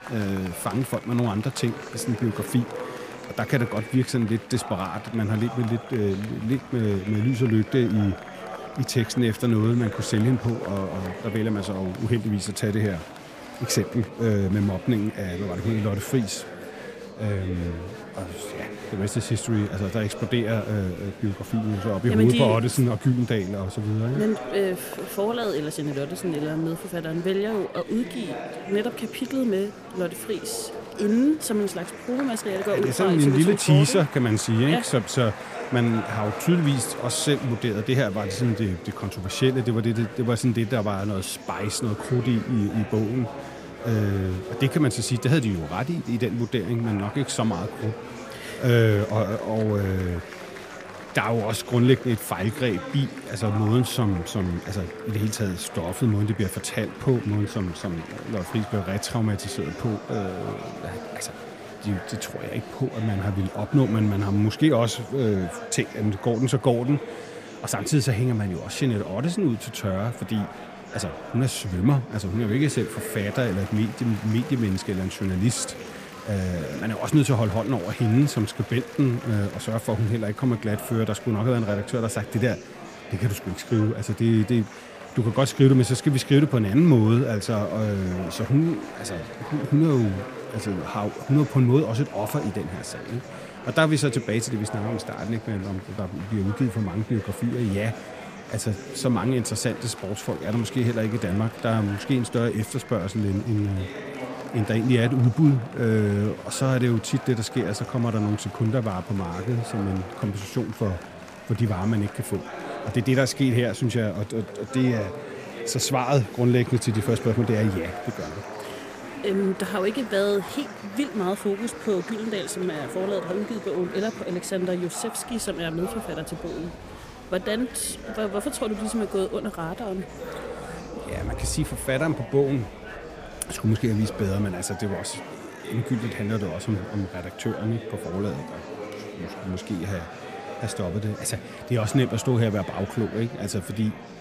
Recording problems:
murmuring crowd; noticeable; throughout; 10 dB below the speech

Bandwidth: 15 kHz